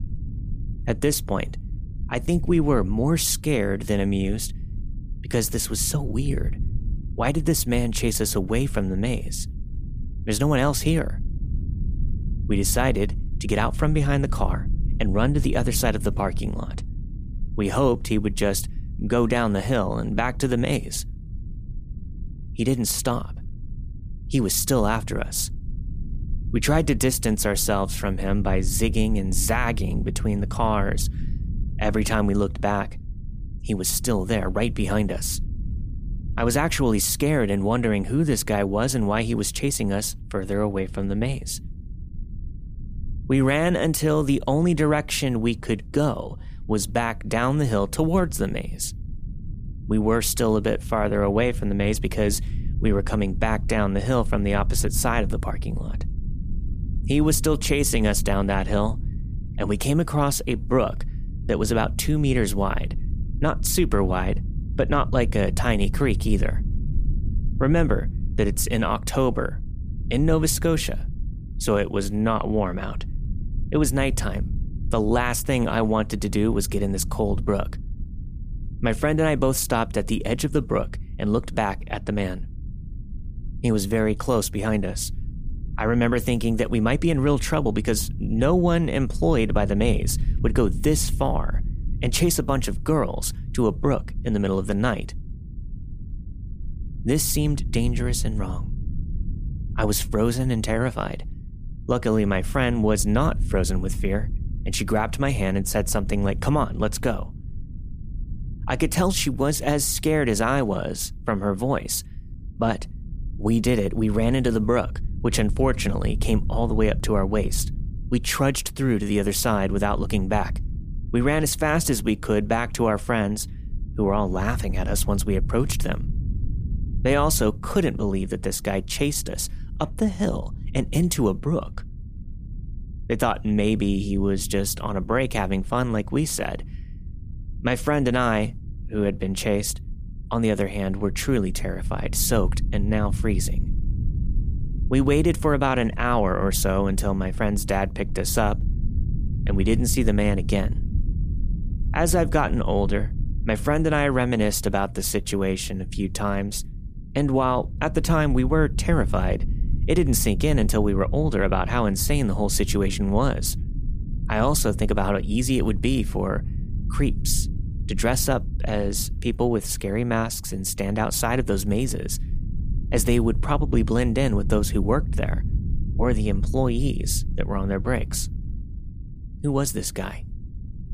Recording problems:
low rumble; faint; throughout; 20 dB below the speech

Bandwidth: 15 kHz